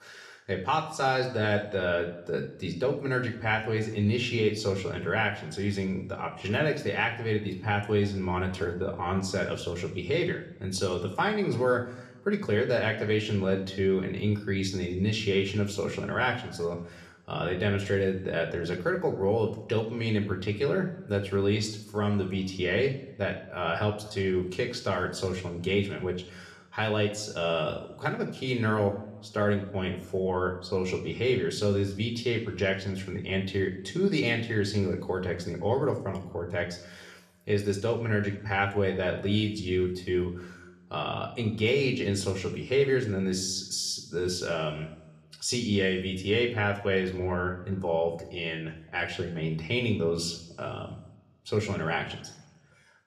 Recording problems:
room echo; slight; dies away in 0.7 s
off-mic speech; somewhat distant

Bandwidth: 13.5 kHz